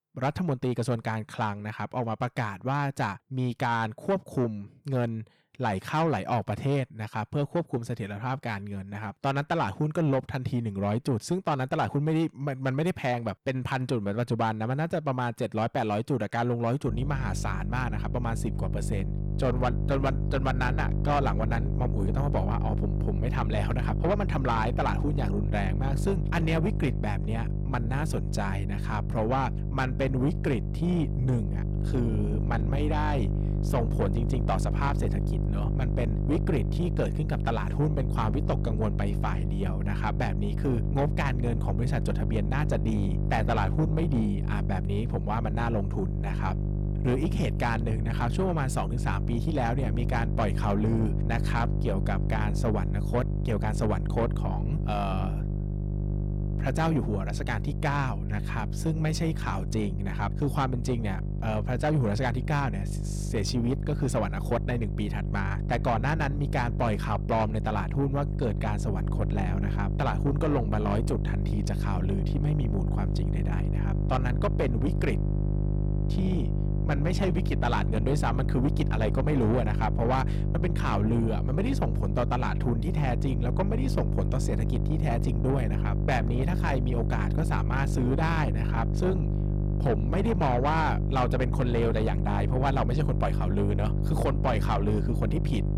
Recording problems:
distortion; slight; 10 dB below the speech
electrical hum; loud; from 17 s on; 50 Hz, 8 dB below the speech

